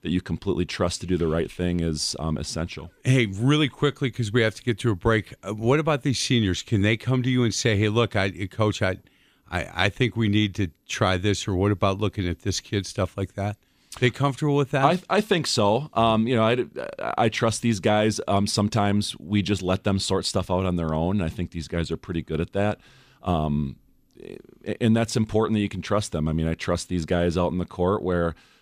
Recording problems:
none

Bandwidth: 15 kHz